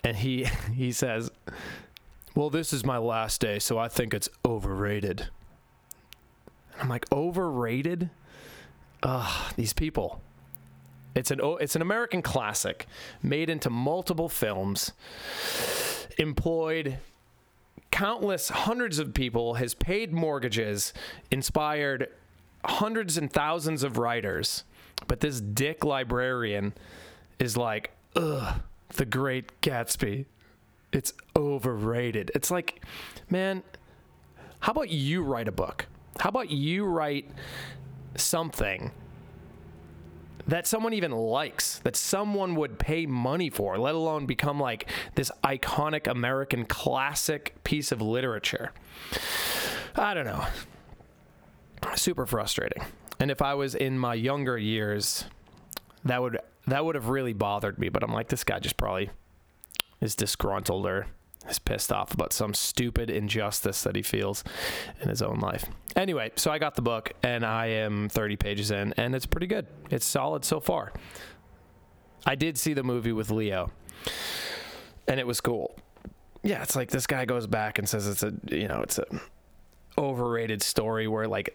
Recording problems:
squashed, flat; heavily

